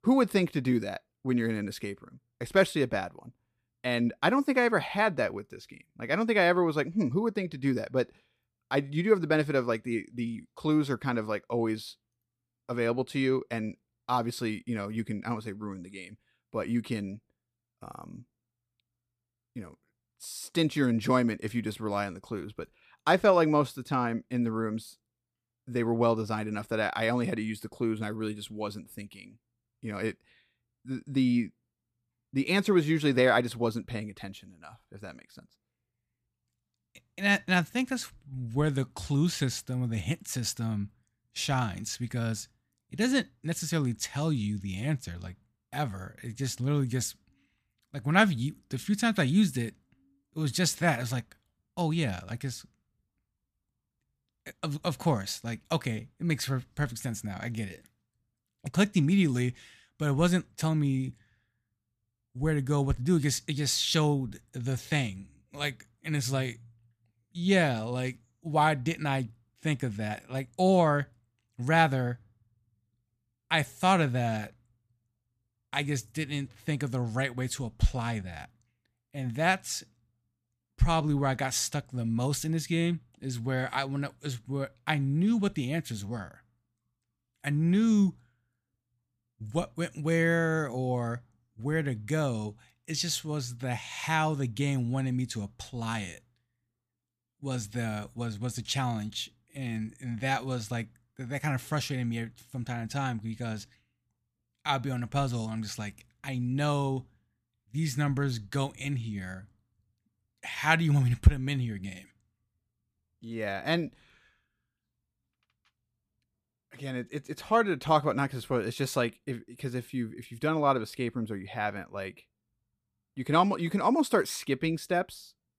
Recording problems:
none

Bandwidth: 14.5 kHz